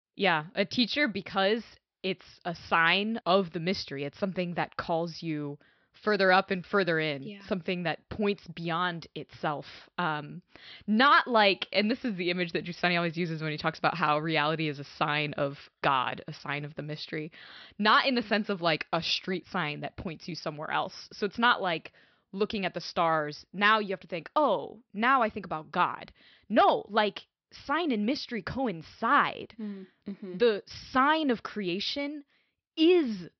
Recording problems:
high frequencies cut off; noticeable; nothing above 5.5 kHz

